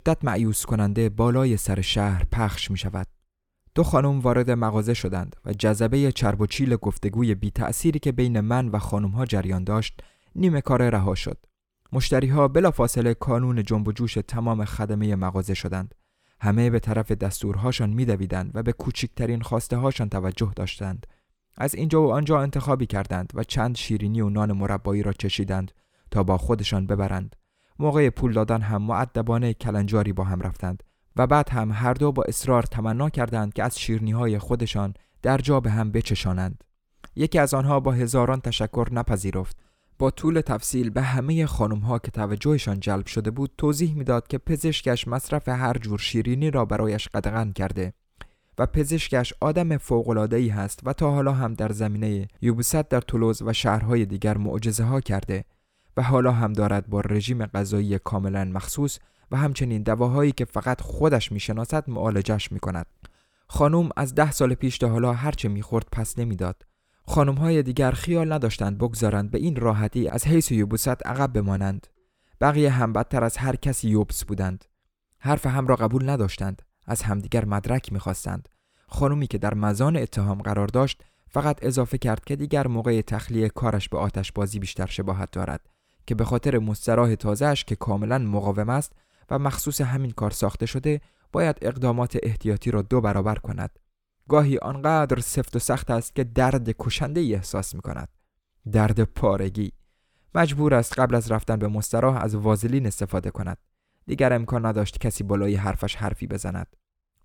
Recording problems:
none

